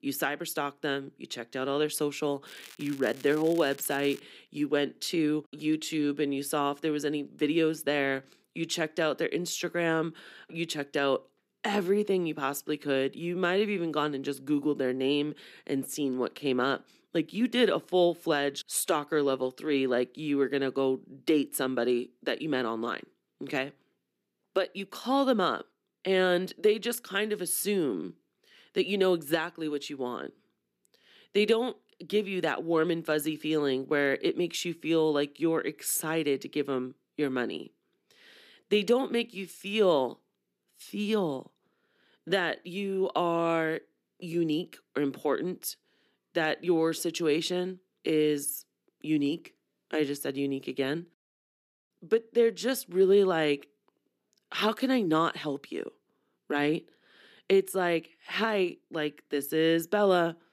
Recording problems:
crackling; noticeable; from 2.5 to 4 s; 20 dB below the speech

